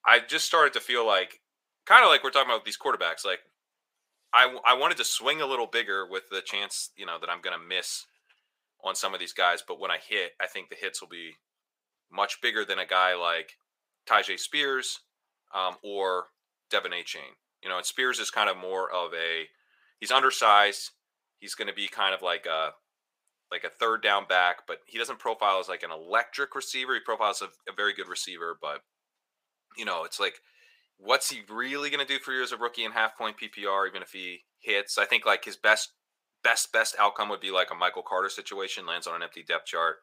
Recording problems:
thin; very; fading below 750 Hz

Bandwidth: 15.5 kHz